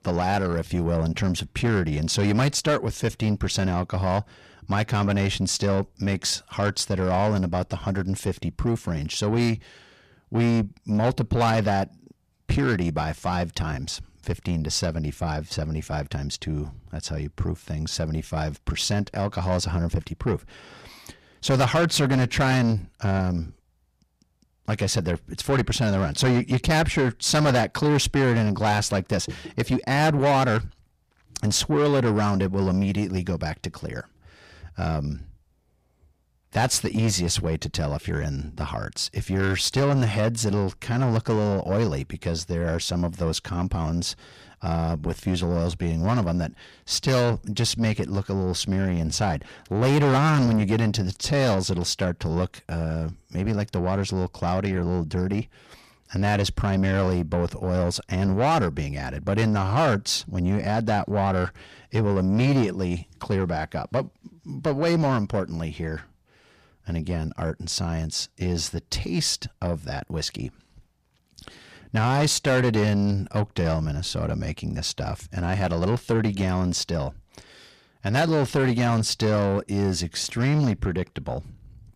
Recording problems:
distortion; heavy; 7 dB below the speech

